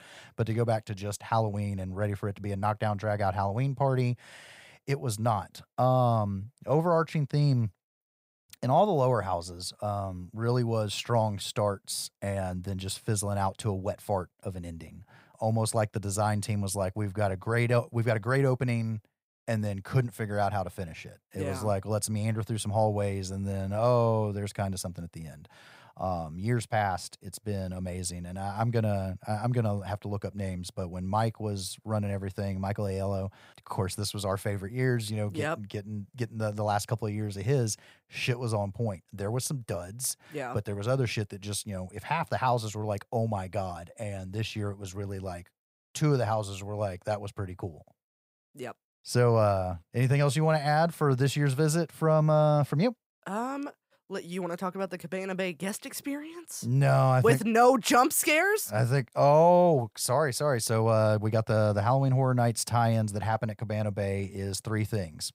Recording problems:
none

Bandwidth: 15.5 kHz